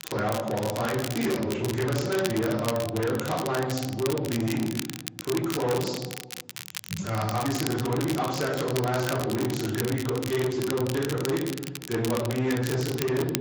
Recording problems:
off-mic speech; far
room echo; noticeable; dies away in 0.7 s
echo of what is said; faint; throughout; 170 ms later, 20 dB below the speech
distortion; slight; 10 dB below the speech
garbled, watery; slightly; nothing above 7.5 kHz
crackle, like an old record; loud; 9 dB below the speech

